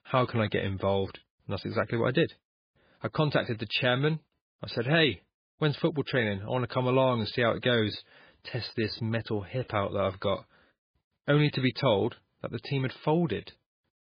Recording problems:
garbled, watery; badly; nothing above 5 kHz

